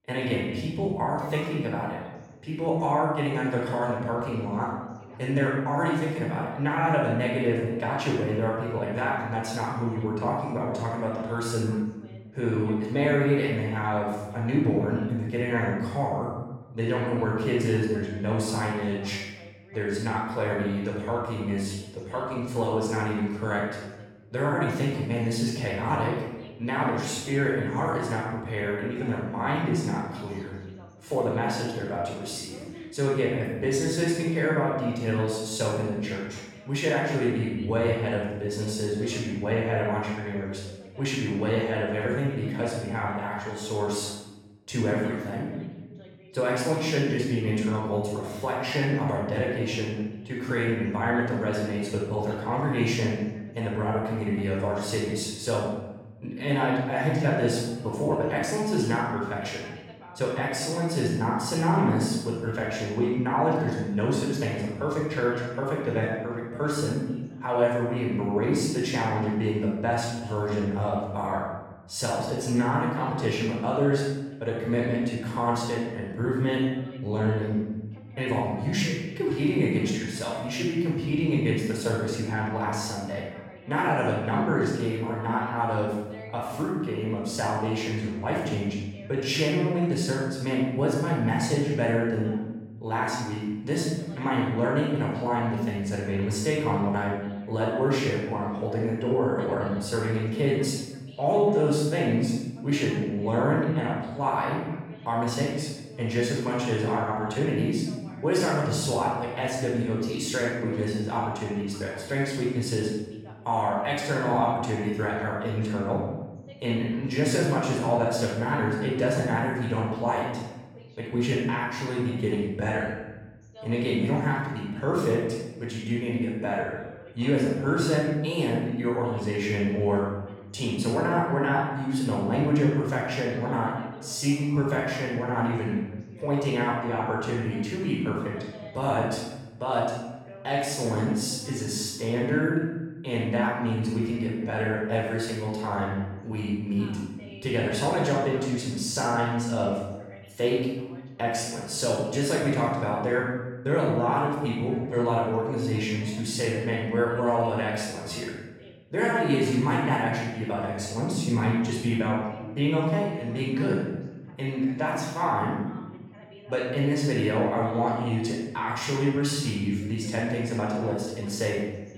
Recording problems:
room echo; strong; dies away in 1 s
off-mic speech; far
voice in the background; faint; throughout; 25 dB below the speech

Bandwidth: 17 kHz